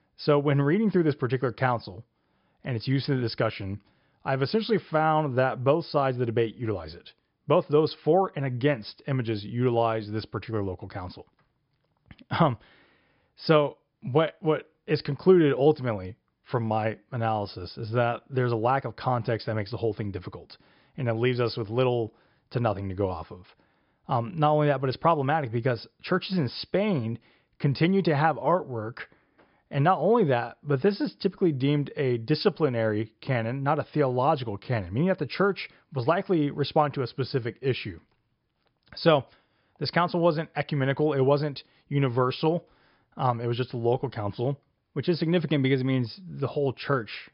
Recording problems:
high frequencies cut off; noticeable; nothing above 5.5 kHz

